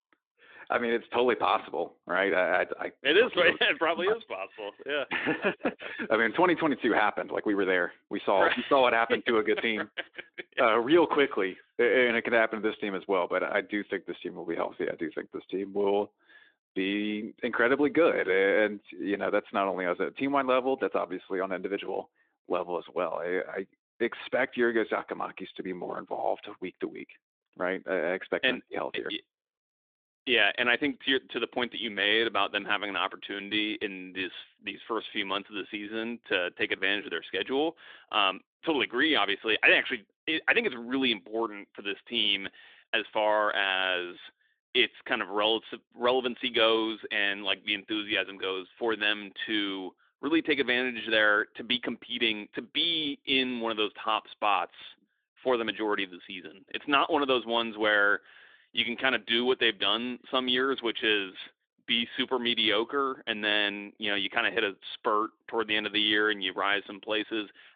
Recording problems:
phone-call audio; nothing above 3.5 kHz

